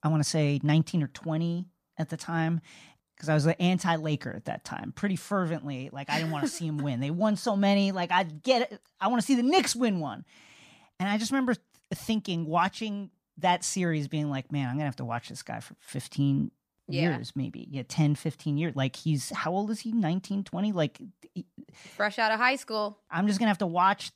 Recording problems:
none

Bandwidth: 15 kHz